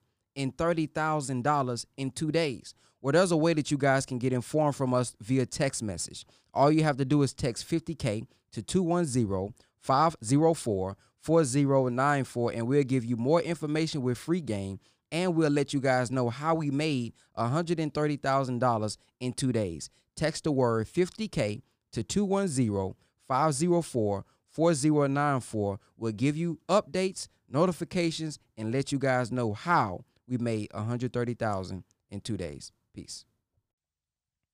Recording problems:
none

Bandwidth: 15 kHz